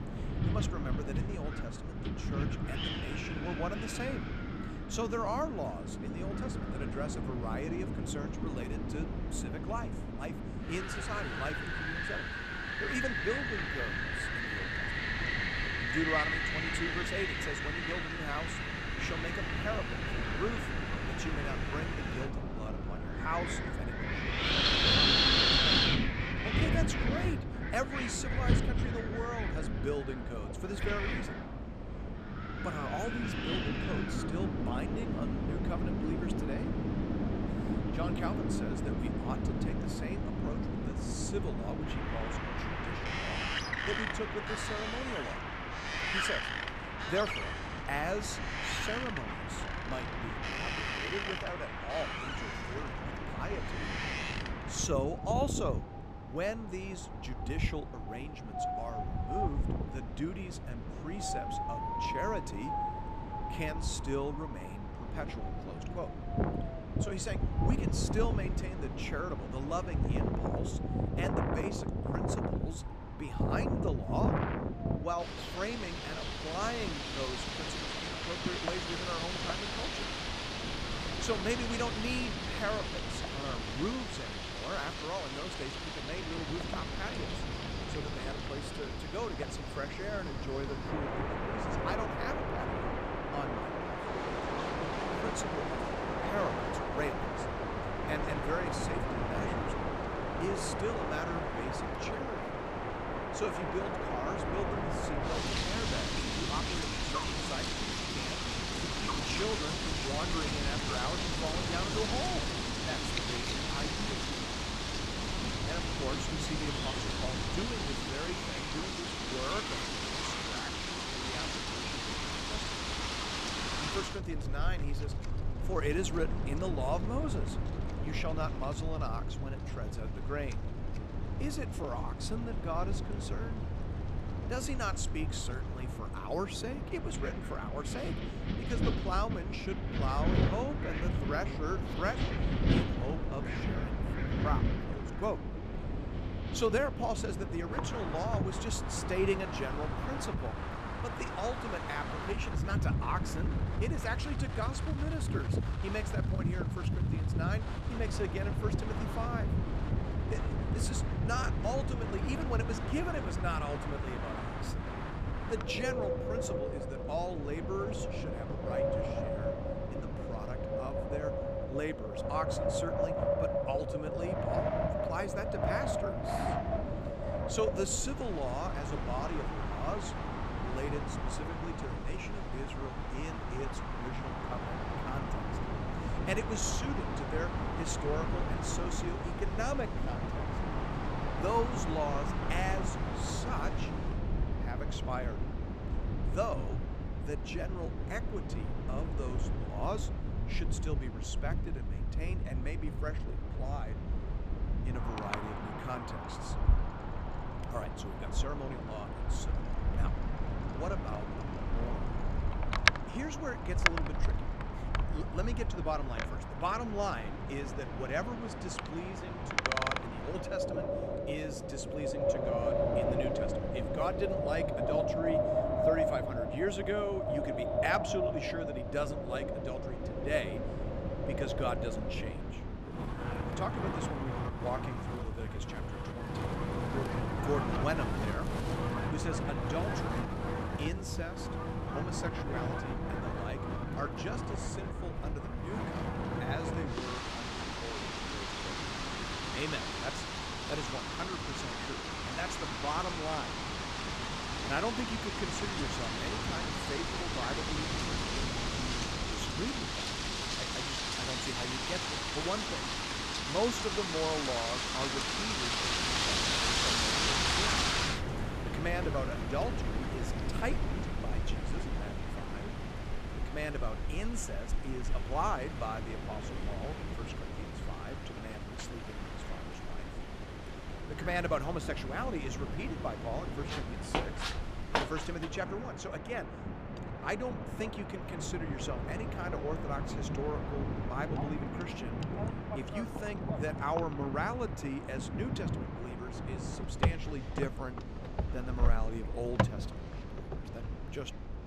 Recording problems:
wind in the background; very loud; throughout; 4 dB above the speech

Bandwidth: 14.5 kHz